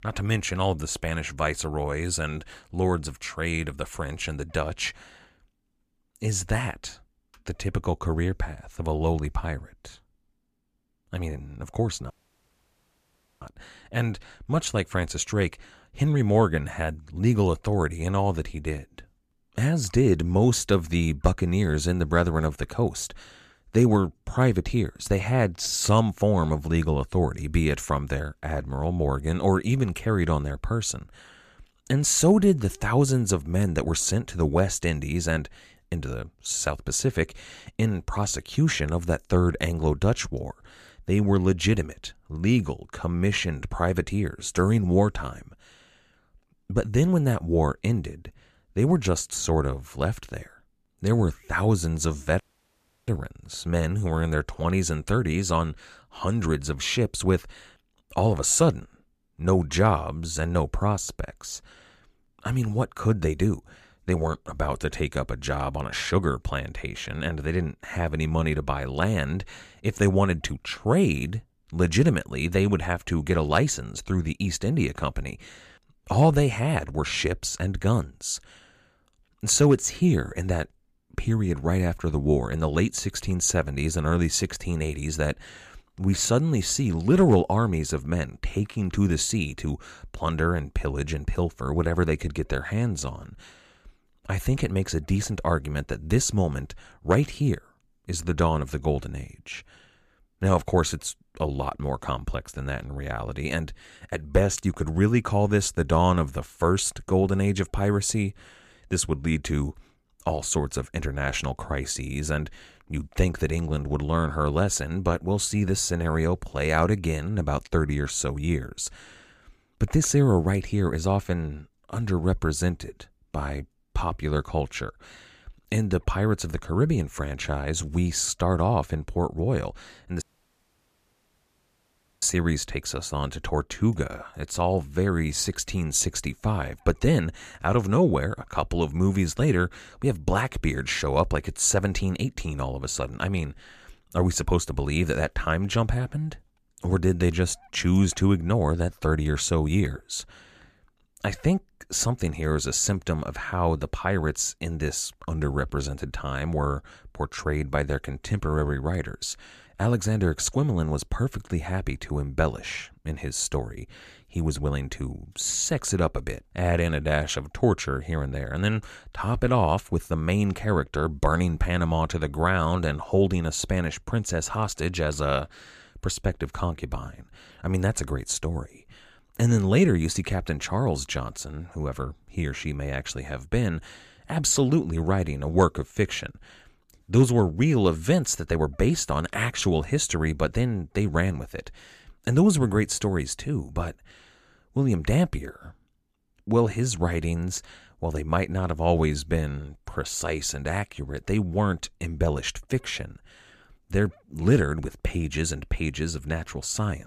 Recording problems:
audio cutting out; at 12 s for 1.5 s, at 52 s for 0.5 s and at 2:10 for 2 s

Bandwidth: 14.5 kHz